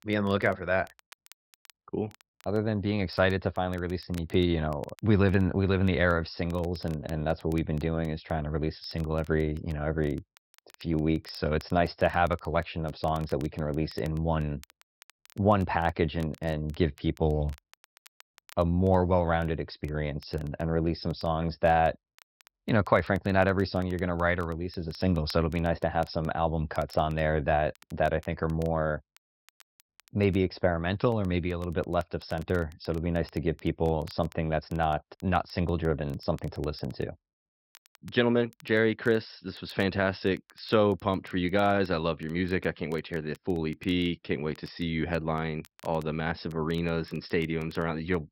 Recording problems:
high frequencies cut off; noticeable; nothing above 5.5 kHz
crackle, like an old record; faint; 30 dB below the speech

